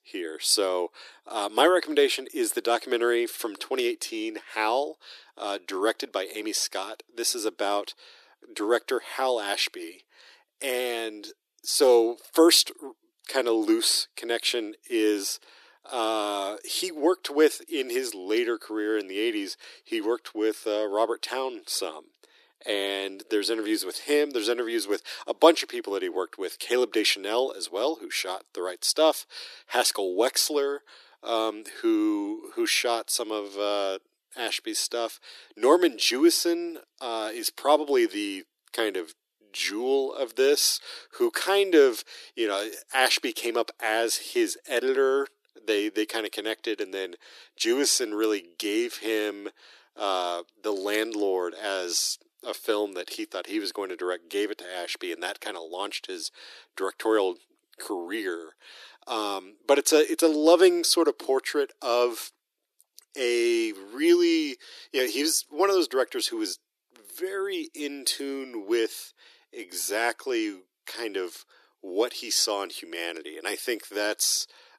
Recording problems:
thin; very; fading below 300 Hz

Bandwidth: 14 kHz